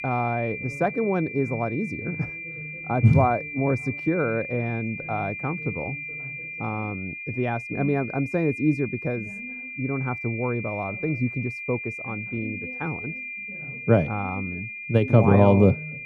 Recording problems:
muffled; very; fading above 2 kHz
high-pitched whine; loud; throughout; 2.5 kHz, 8 dB below the speech
voice in the background; noticeable; throughout; 20 dB below the speech

